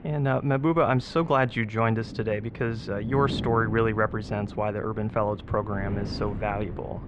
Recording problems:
muffled; slightly; fading above 3.5 kHz
wind noise on the microphone; occasional gusts; 15 dB below the speech

